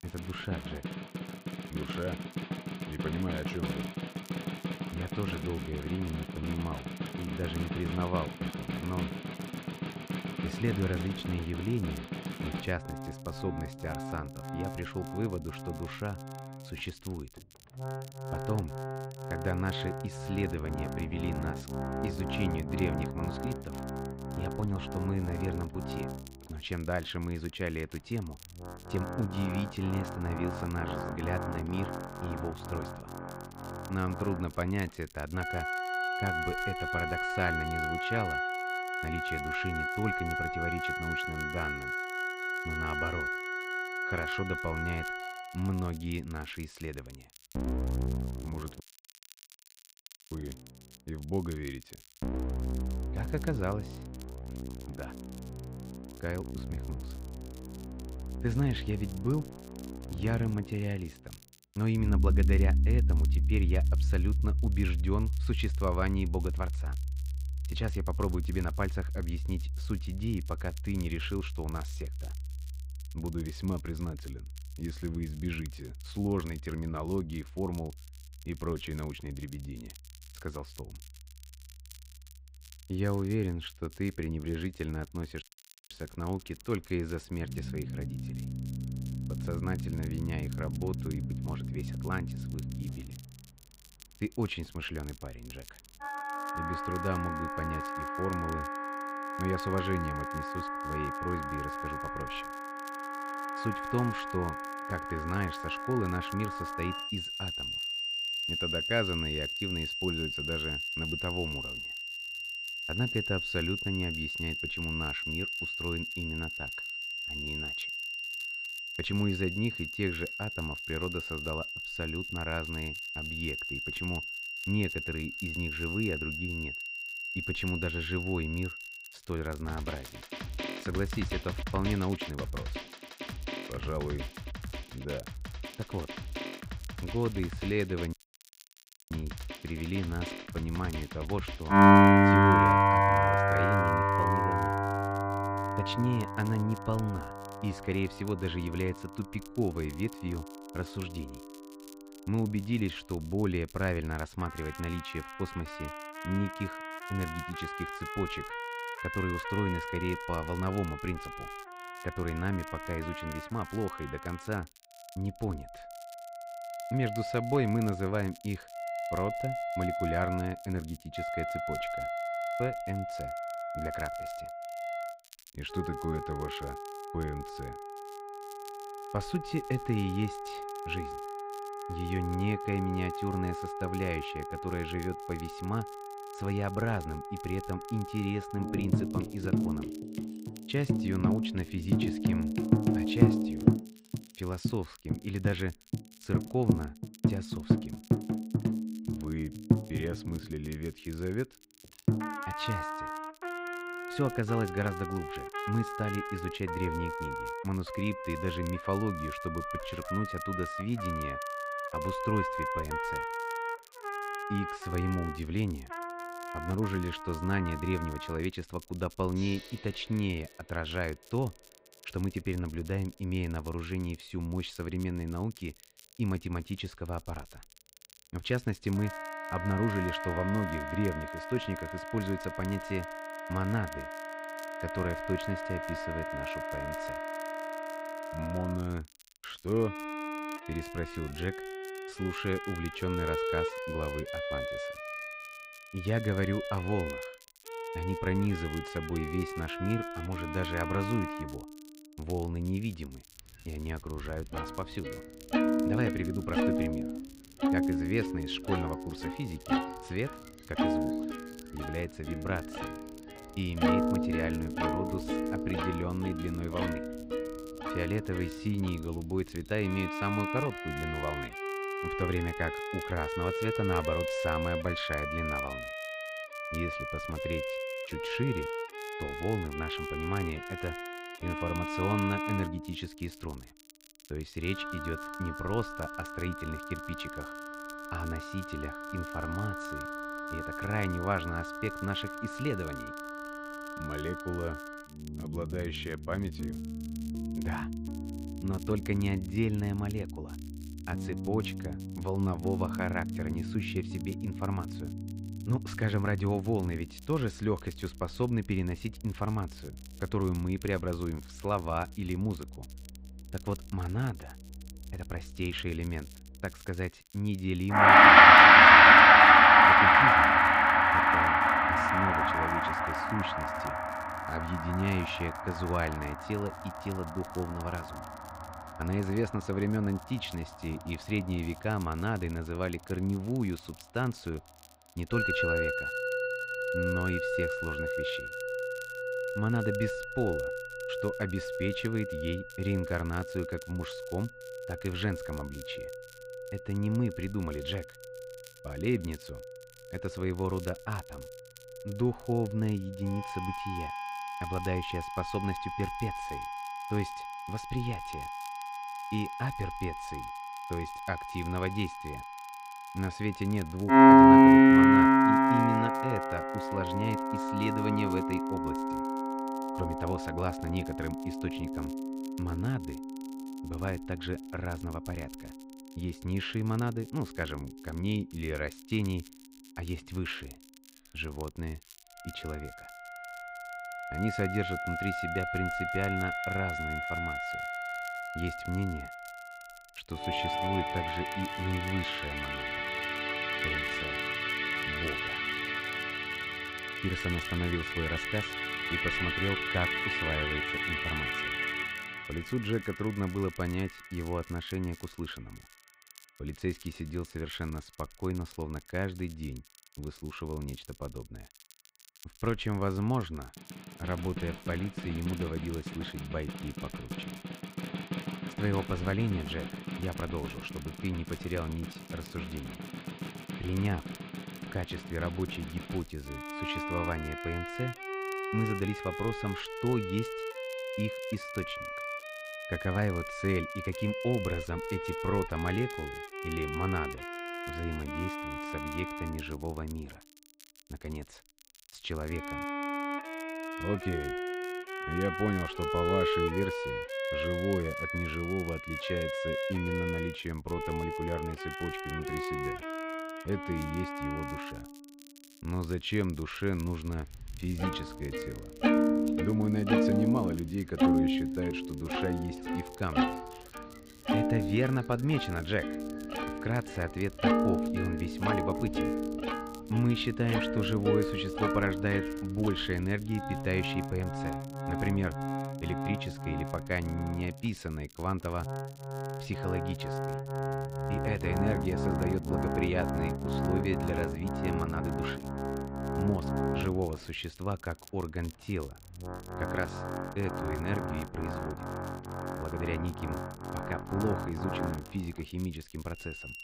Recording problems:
muffled; slightly; fading above 2.5 kHz
background music; very loud; throughout; 5 dB above the speech
crackle, like an old record; faint; 20 dB below the speech
audio cutting out; at 49 s for 1.5 s, at 1:25 and at 2:18 for 1 s

